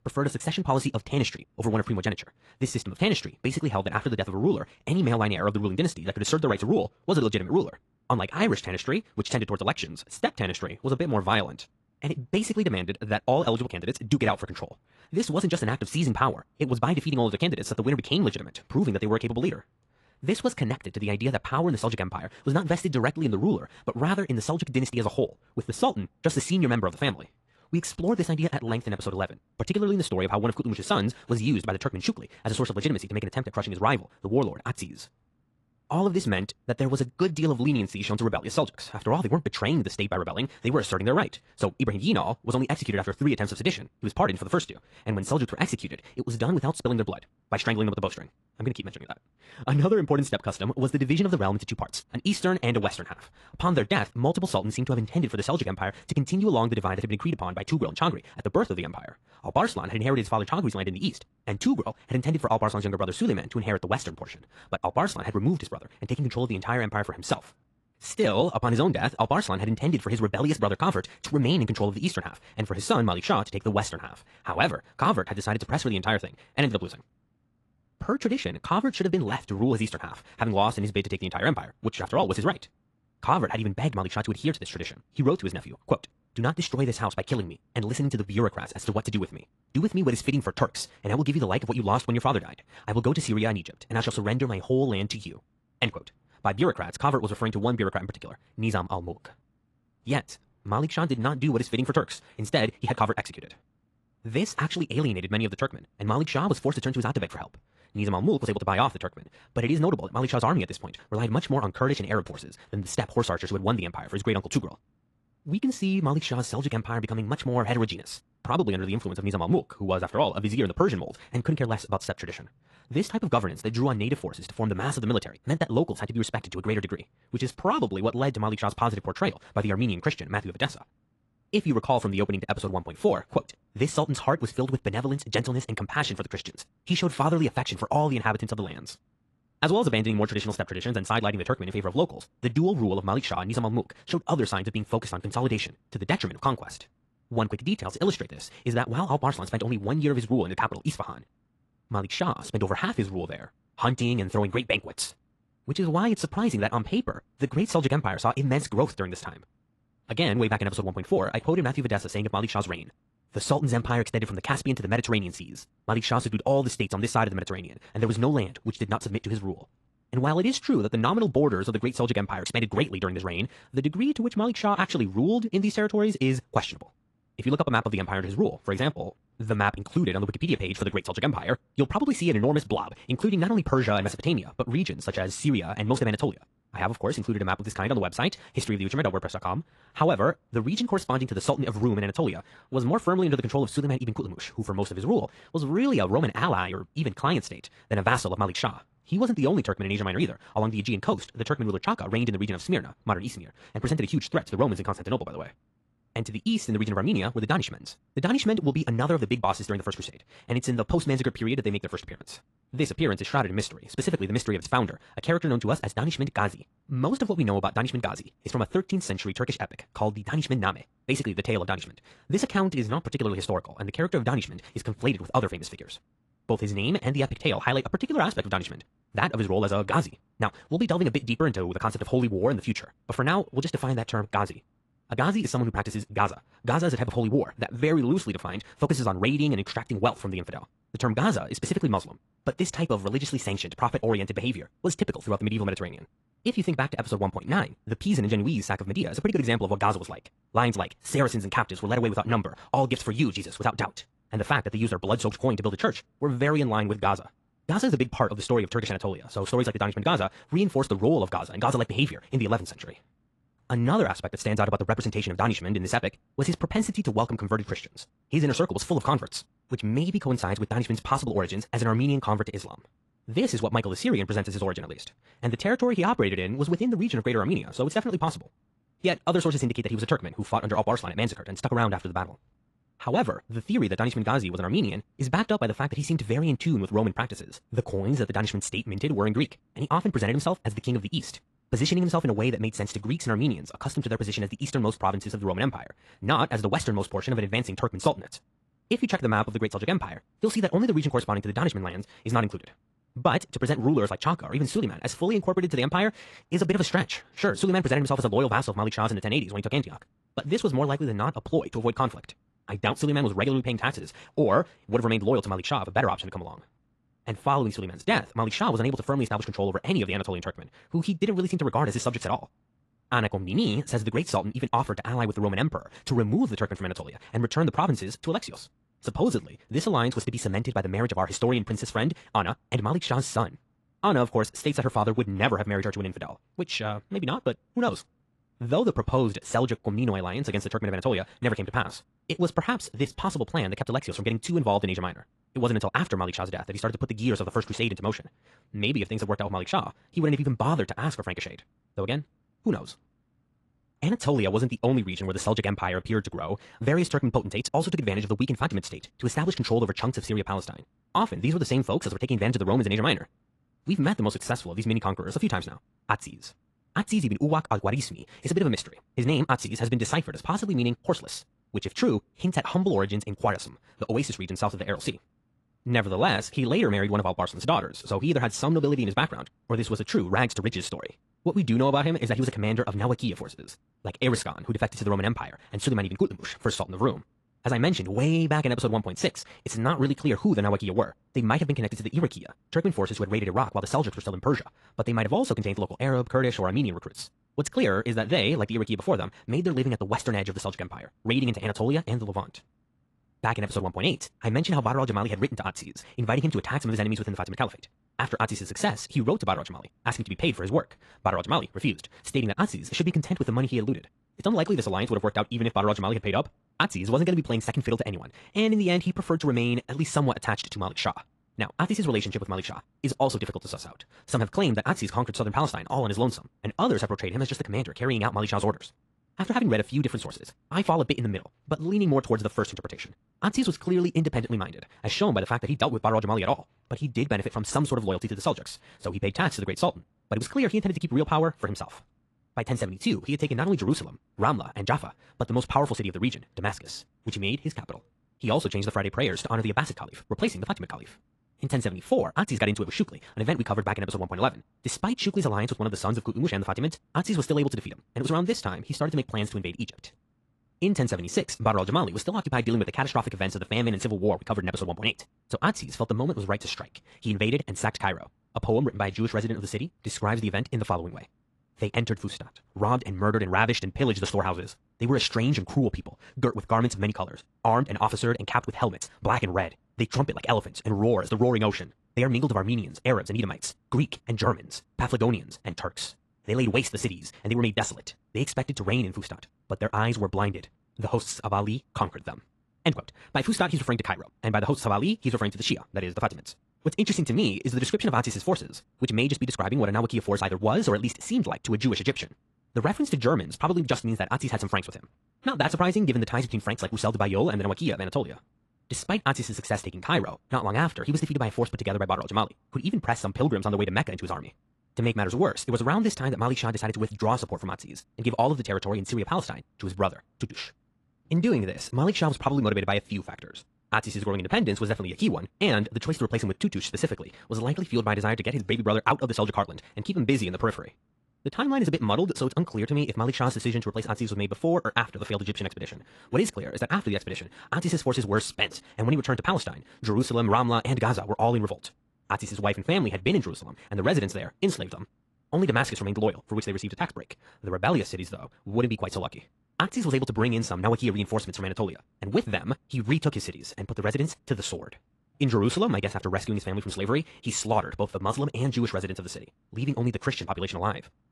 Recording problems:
wrong speed, natural pitch; too fast; 1.7 times normal speed
garbled, watery; slightly; nothing above 11 kHz

